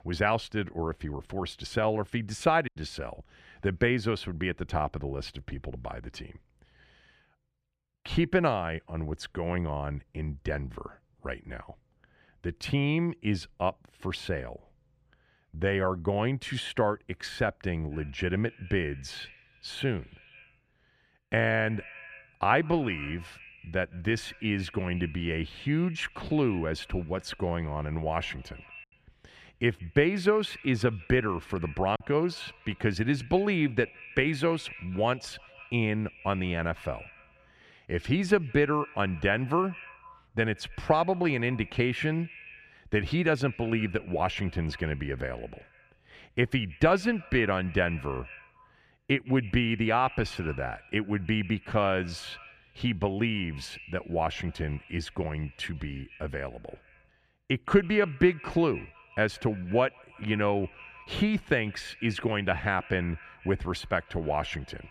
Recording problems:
echo of what is said; faint; from 18 s on; 160 ms later, 20 dB below the speech
choppy; occasionally; at 2.5 s and at 32 s; 2% of the speech affected

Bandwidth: 14.5 kHz